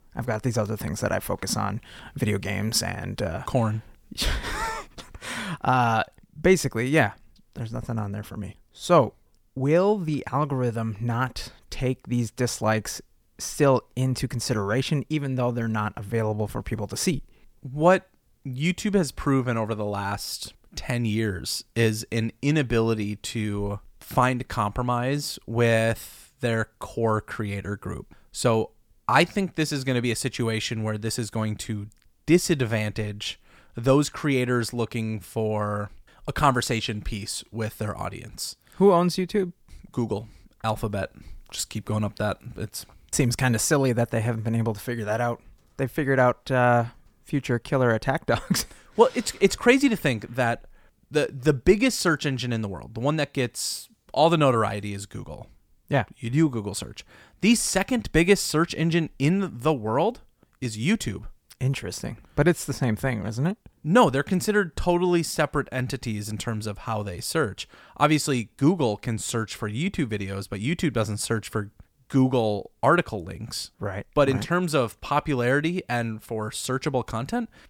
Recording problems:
none

